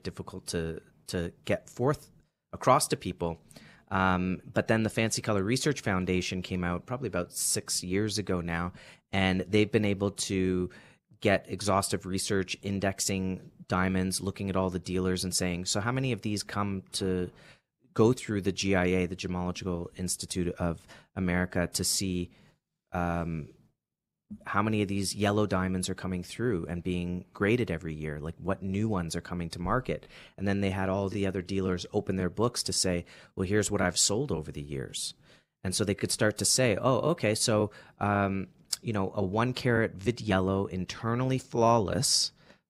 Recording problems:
none

